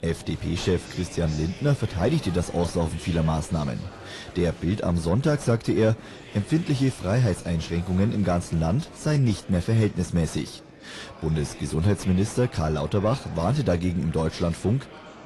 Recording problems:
distortion; slight; 10 dB below the speech
garbled, watery; slightly; nothing above 11 kHz
murmuring crowd; noticeable; throughout; 20 dB below the speech

